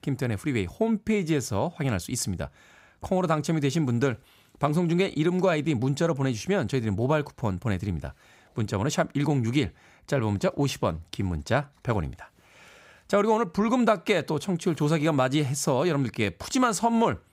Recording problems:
none

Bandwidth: 15.5 kHz